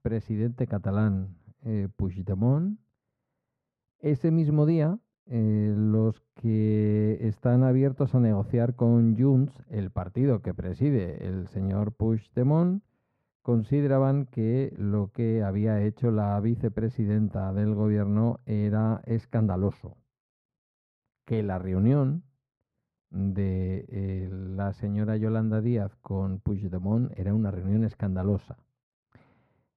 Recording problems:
muffled; very; fading above 2.5 kHz

